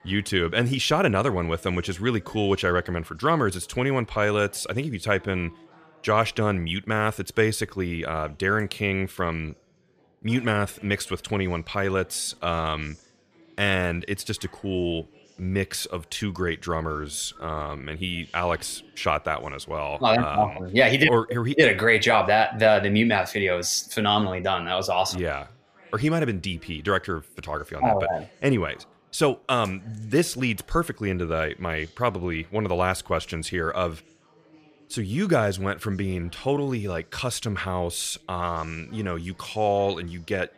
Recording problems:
chatter from many people; faint; throughout; 30 dB below the speech

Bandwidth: 14.5 kHz